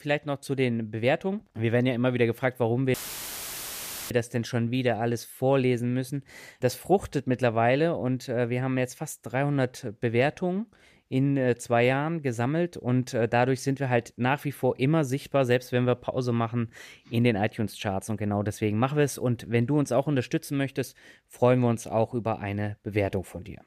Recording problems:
audio cutting out; filled with static; at 3 s for 1 s

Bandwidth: 14.5 kHz